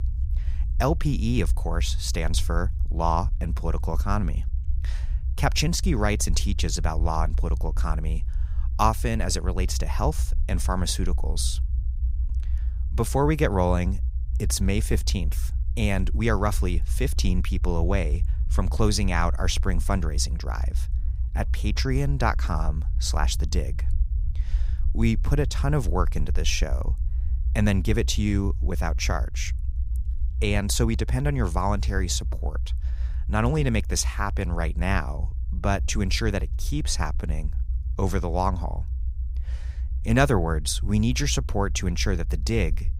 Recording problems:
low rumble; faint; throughout; 20 dB below the speech

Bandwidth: 15.5 kHz